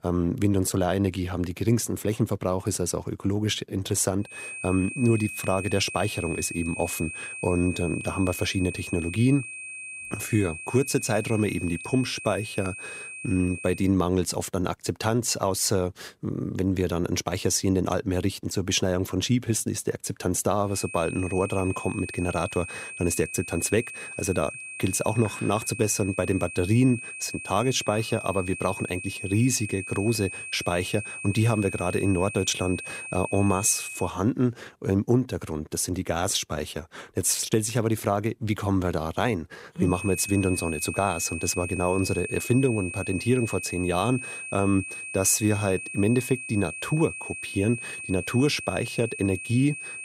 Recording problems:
high-pitched whine; loud; from 4.5 to 14 s, from 21 to 34 s and from 40 s on; 2.5 kHz, 9 dB below the speech

